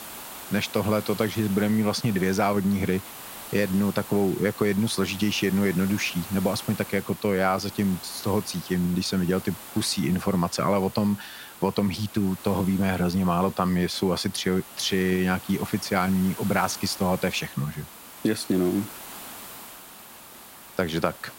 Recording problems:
hiss; noticeable; throughout; 15 dB below the speech

